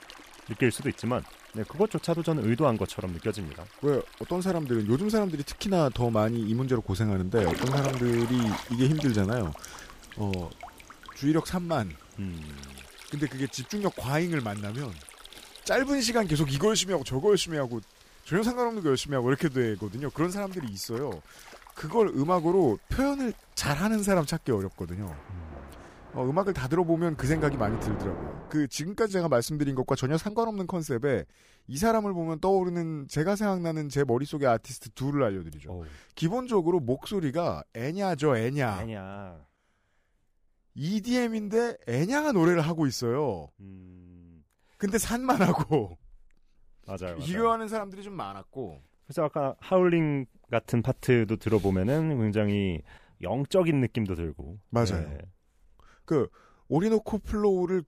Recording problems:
rain or running water; noticeable; until 28 s; 15 dB below the speech

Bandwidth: 15 kHz